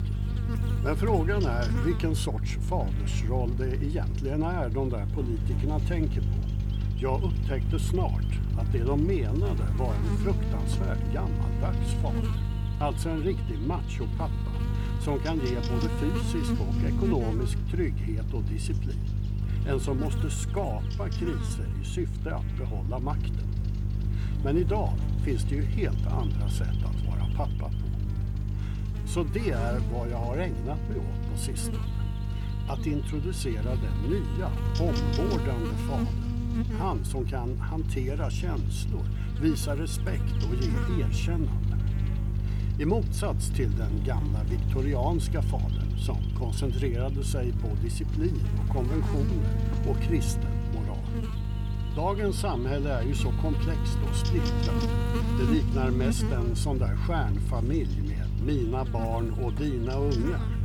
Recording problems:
electrical hum; loud; throughout; 50 Hz, 5 dB below the speech

